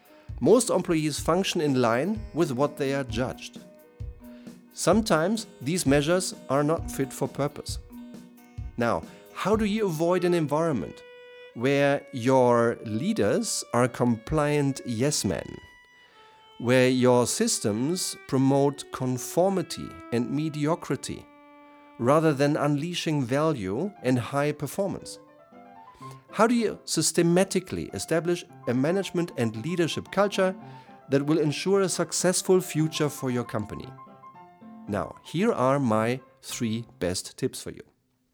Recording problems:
background music; faint; throughout; 20 dB below the speech

